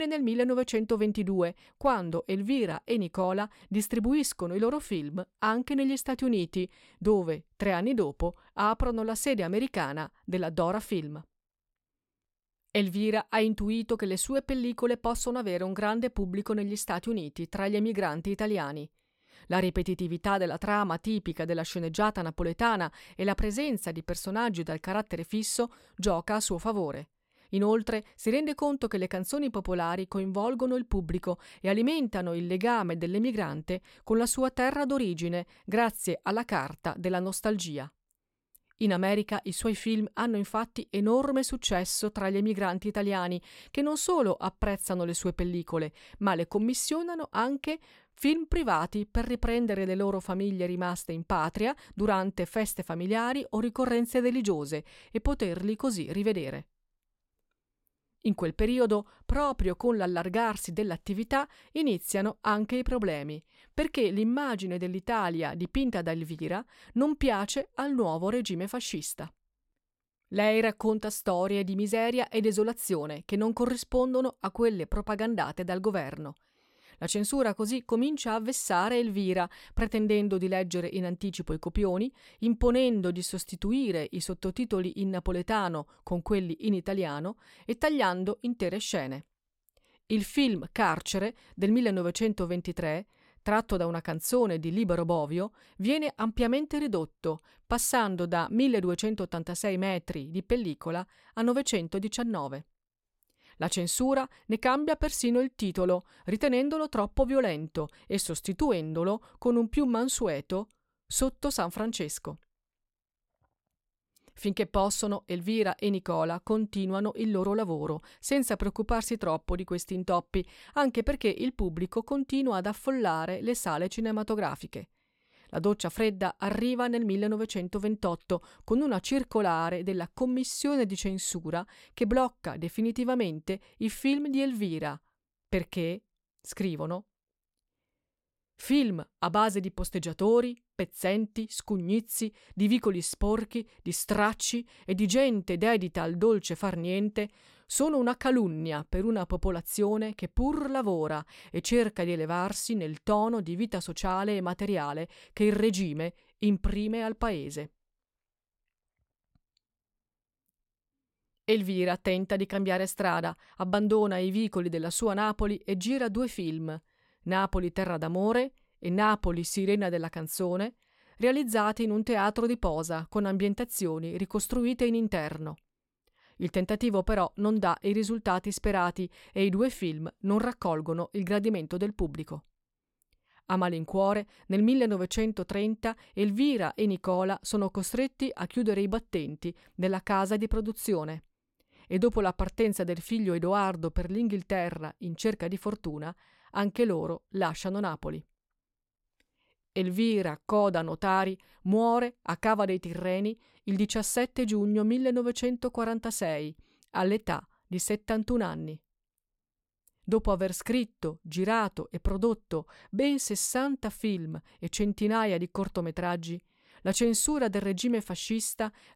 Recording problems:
abrupt cut into speech; at the start

